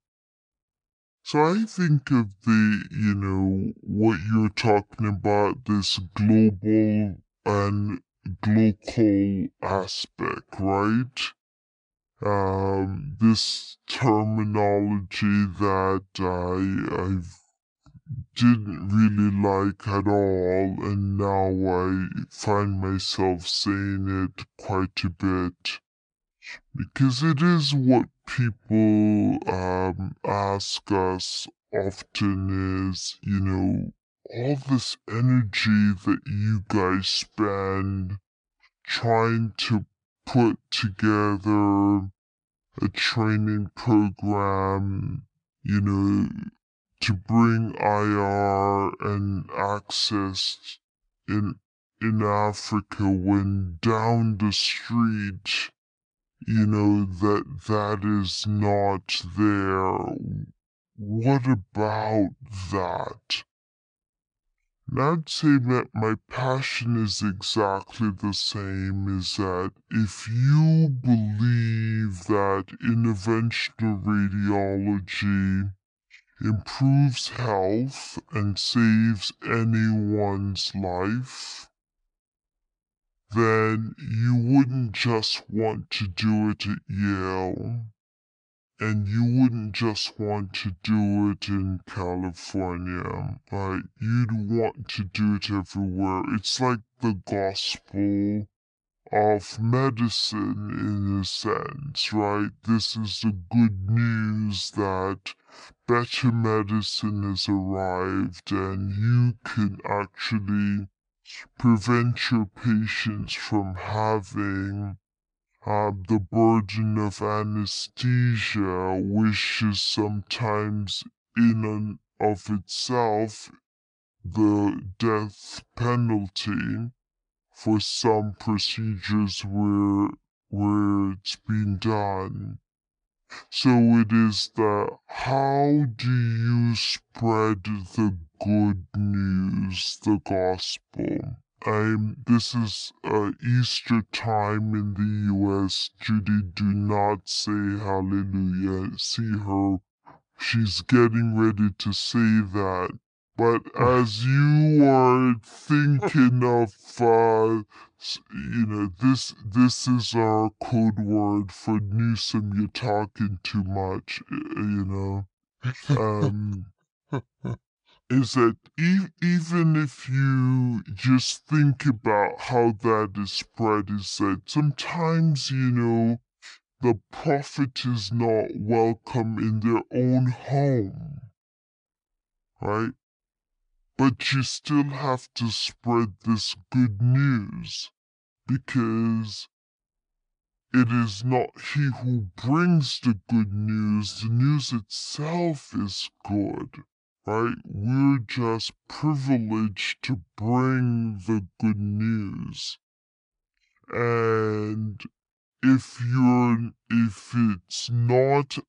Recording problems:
wrong speed and pitch; too slow and too low; 0.6 times normal speed

